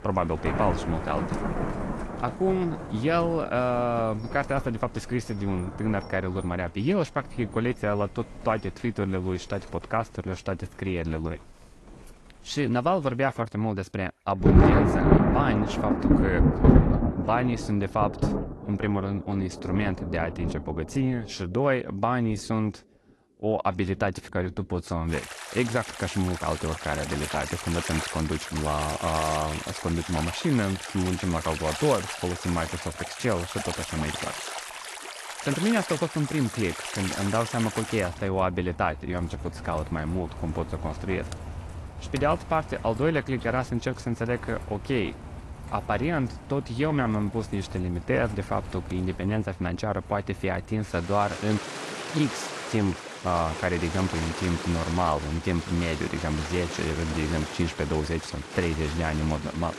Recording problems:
garbled, watery; slightly; nothing above 11.5 kHz
rain or running water; loud; throughout; 3 dB below the speech

